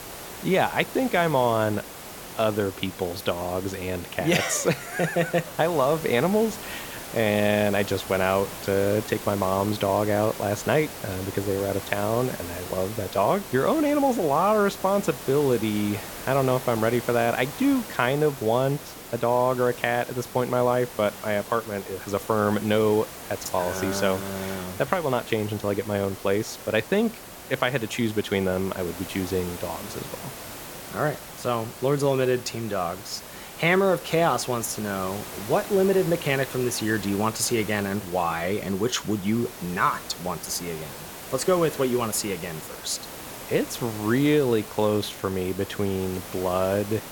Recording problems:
hiss; noticeable; throughout; 10 dB below the speech

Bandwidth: 17.5 kHz